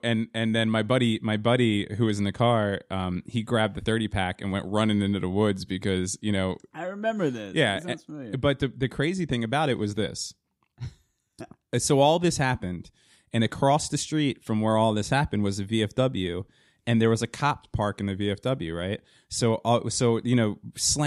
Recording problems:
abrupt cut into speech; at the end

